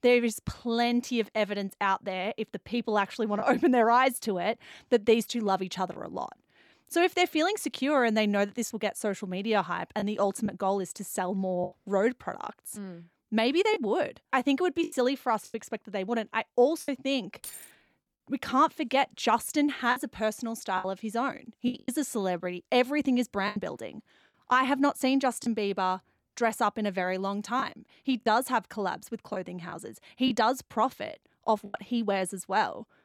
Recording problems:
choppy; occasionally; 4% of the speech affected
jangling keys; faint; at 17 s; peak 15 dB below the speech

